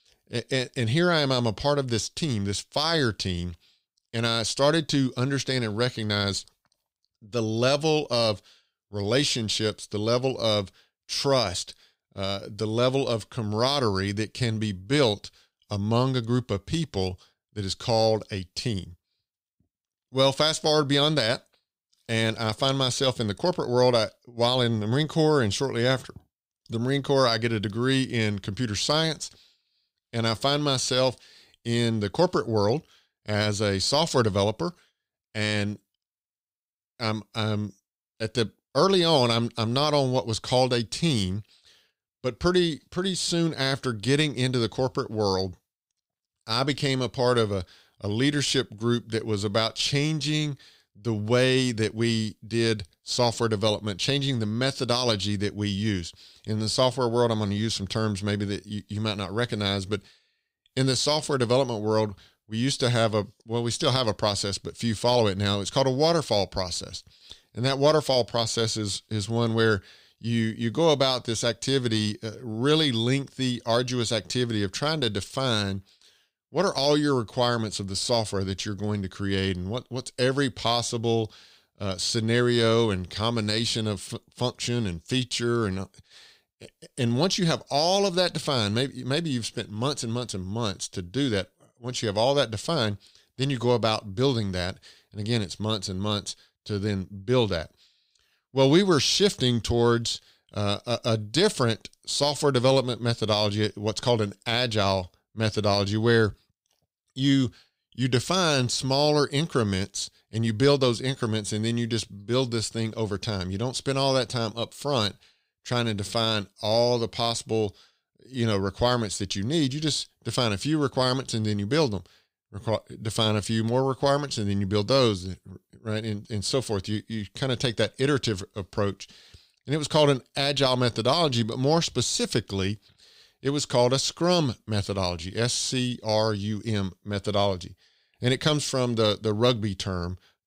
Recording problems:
none

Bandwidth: 15.5 kHz